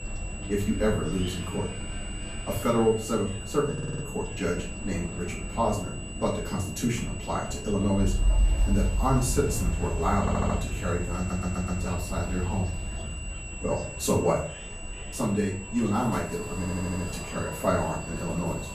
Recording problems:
off-mic speech; far
room echo; slight; dies away in 0.4 s
wind in the background; loud; throughout; 7 dB below the speech
high-pitched whine; noticeable; throughout; 2.5 kHz, 10 dB below the speech
background chatter; faint; throughout; 2 voices, 25 dB below the speech
audio stuttering; 4 times, first at 3.5 s

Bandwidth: 14.5 kHz